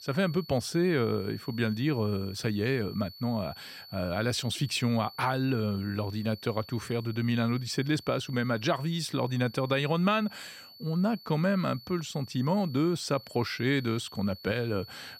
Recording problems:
high-pitched whine; noticeable; throughout; 4.5 kHz, 20 dB below the speech

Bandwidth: 16 kHz